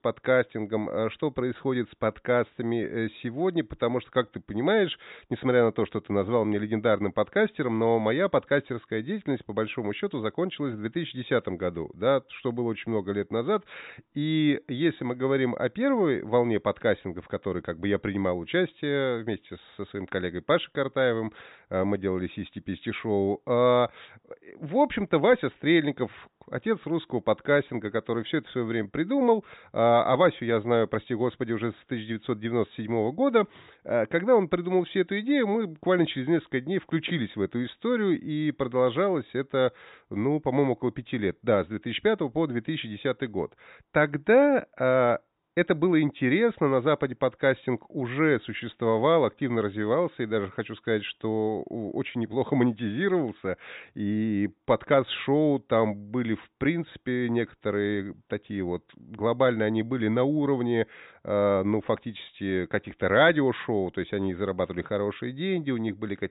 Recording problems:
high frequencies cut off; severe; nothing above 4 kHz

